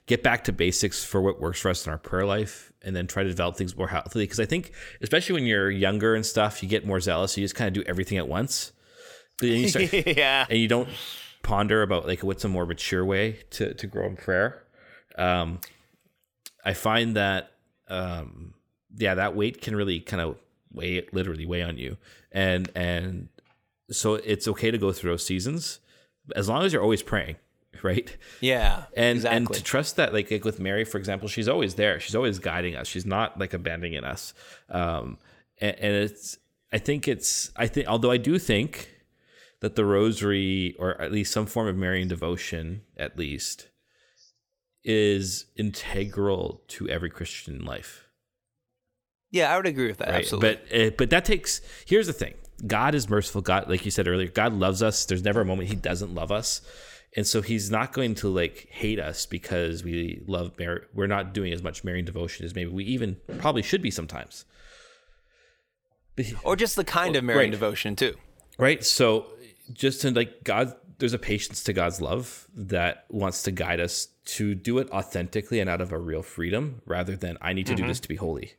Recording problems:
none

